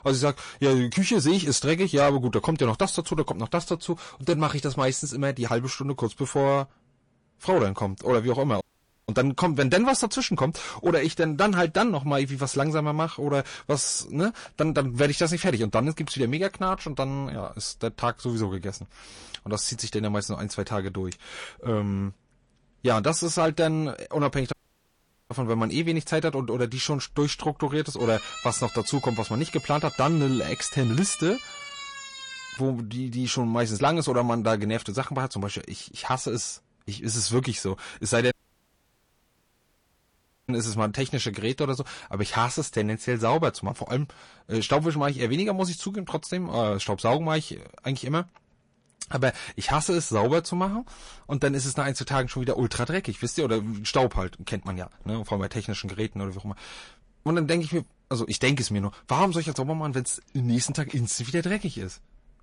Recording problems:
distortion; slight; 10 dB below the speech
garbled, watery; slightly; nothing above 10.5 kHz
audio cutting out; at 8.5 s, at 25 s for 1 s and at 38 s for 2 s
siren; noticeable; from 28 to 33 s; peak 10 dB below the speech

